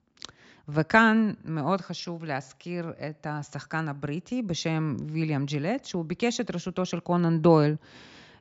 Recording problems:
high frequencies cut off; noticeable; nothing above 8 kHz

